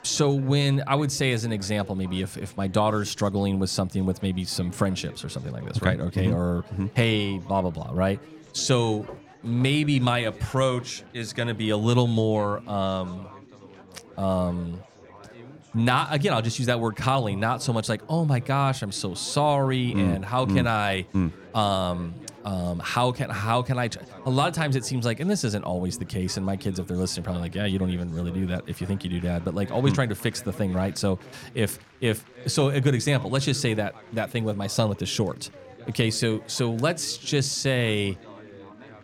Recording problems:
chatter from many people; faint; throughout; 20 dB below the speech

